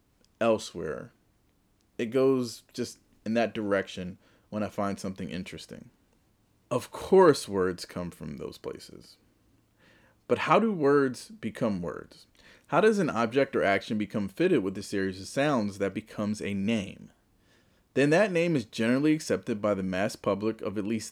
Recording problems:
none

